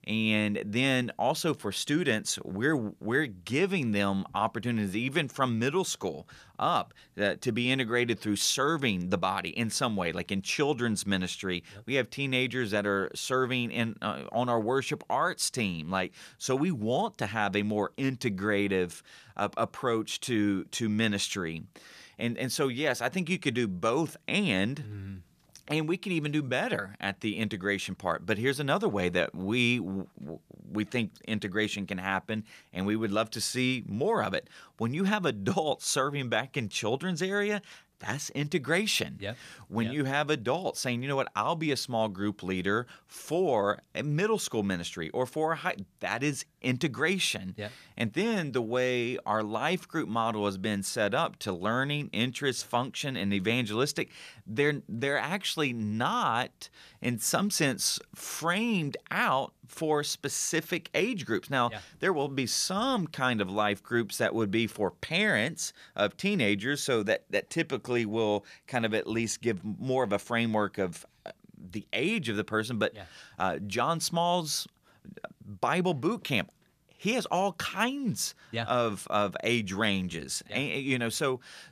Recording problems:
none

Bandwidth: 14.5 kHz